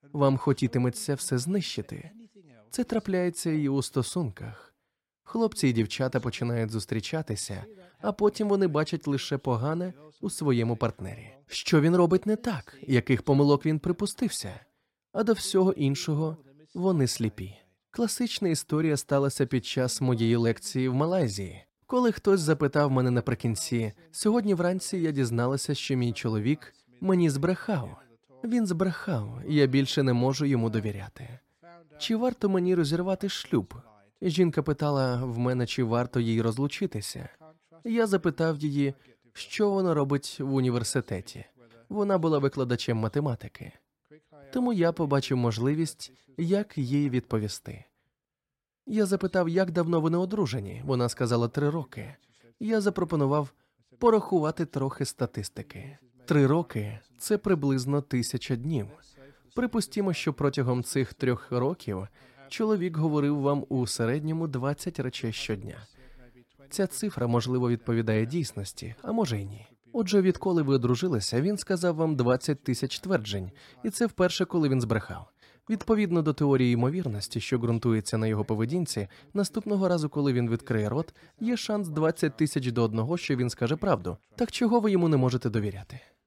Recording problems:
none

